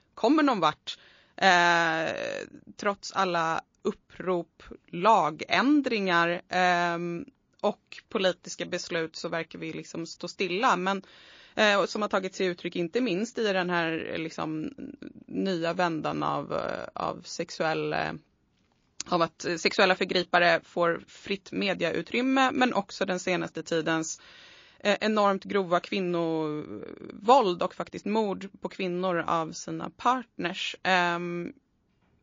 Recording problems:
garbled, watery; slightly

